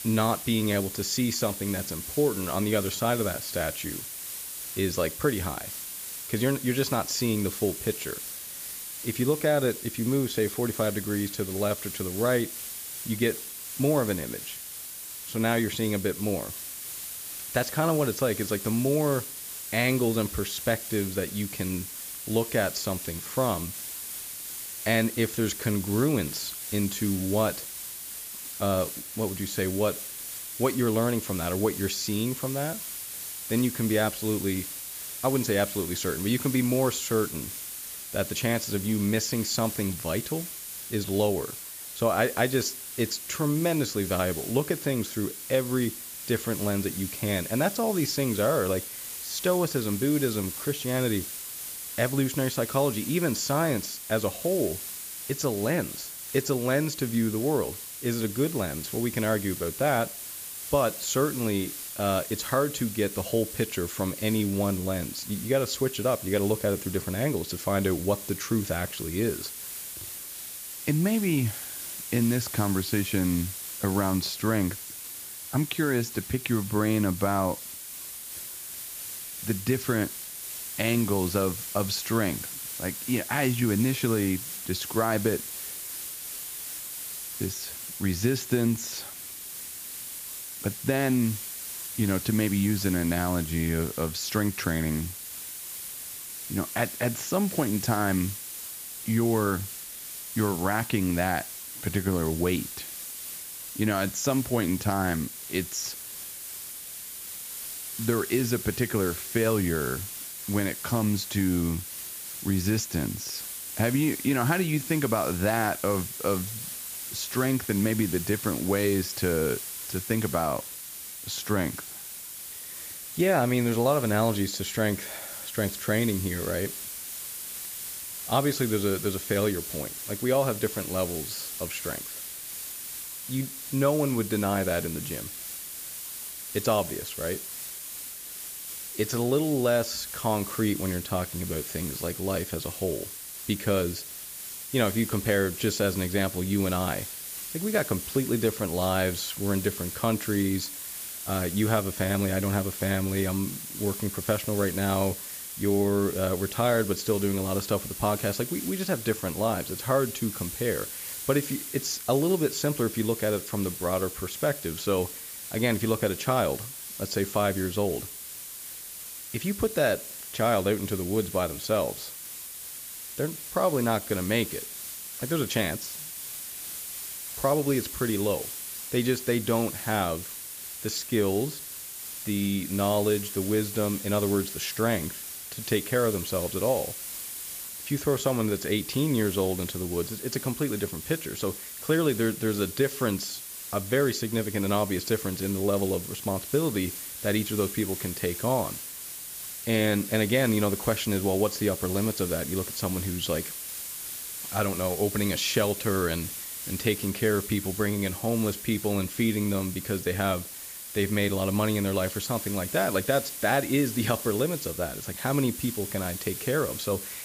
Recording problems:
high frequencies cut off; noticeable; nothing above 8 kHz
hiss; loud; throughout; 7 dB below the speech

